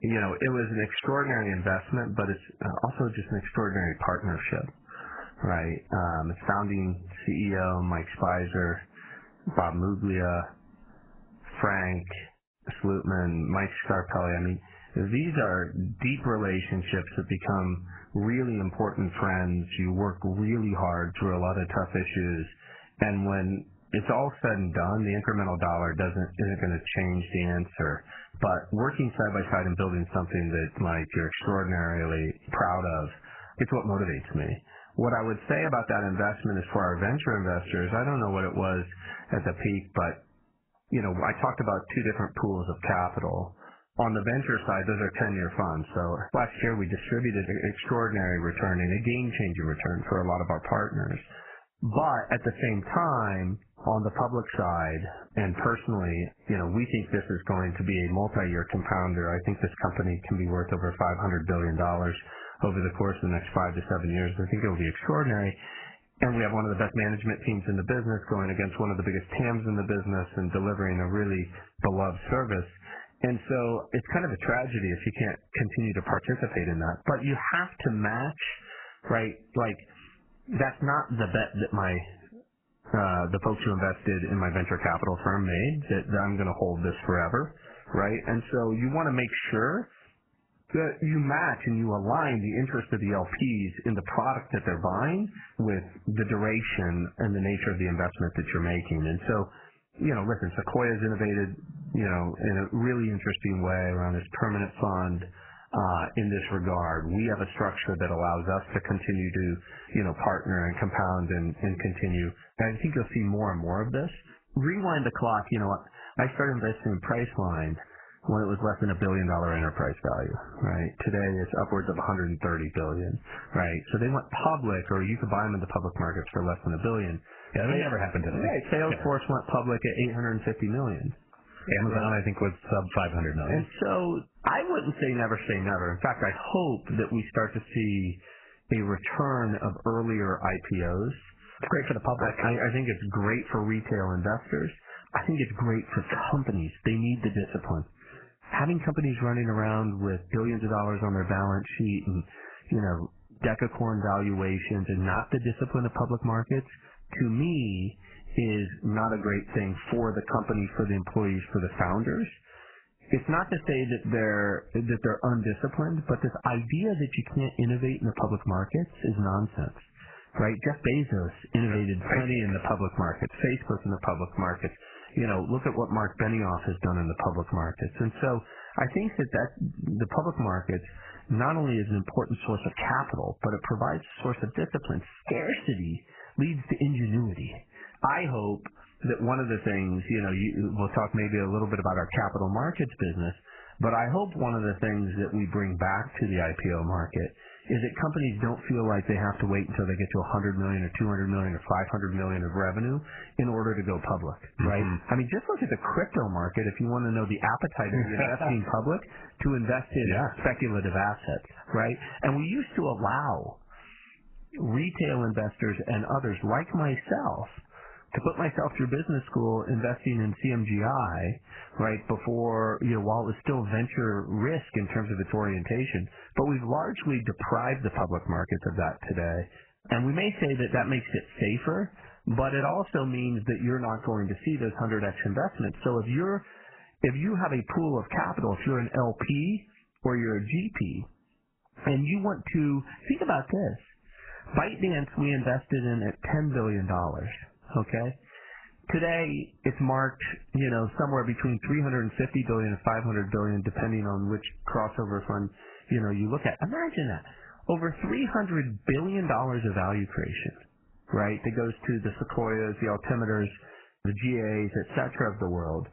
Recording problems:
garbled, watery; badly; nothing above 3 kHz
squashed, flat; somewhat

